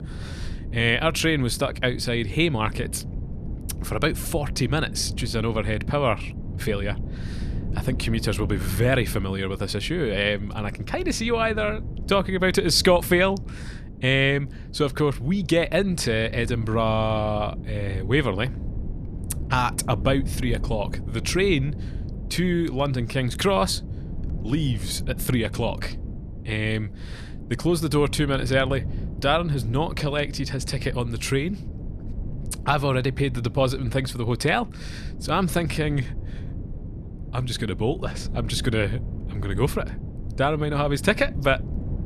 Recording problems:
wind noise on the microphone; occasional gusts; 20 dB below the speech

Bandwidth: 14 kHz